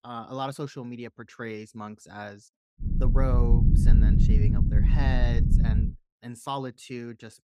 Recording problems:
low rumble; loud; from 3 to 6 s; 2 dB below the speech

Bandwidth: 15.5 kHz